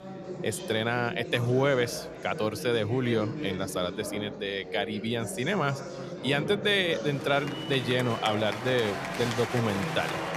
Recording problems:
chatter from many people; loud; throughout; 7 dB below the speech

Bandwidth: 14.5 kHz